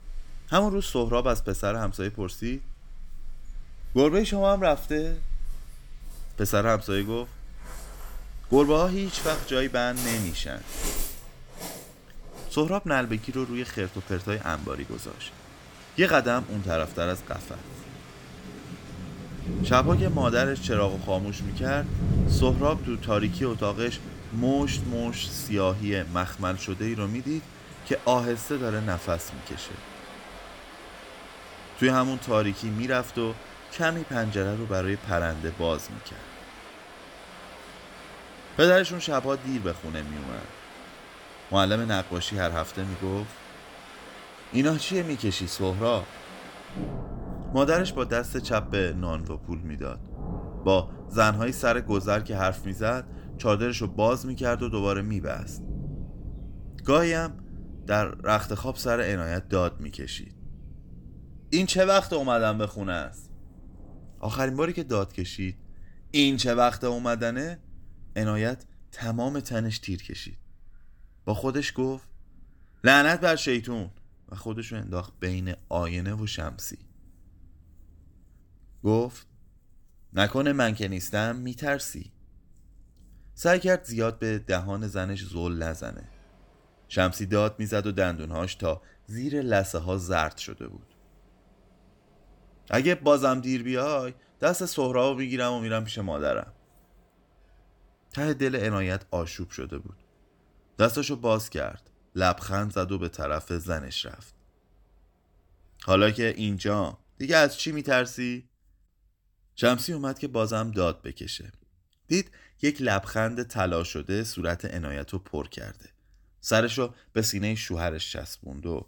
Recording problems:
rain or running water; noticeable; throughout; 10 dB below the speech

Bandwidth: 18 kHz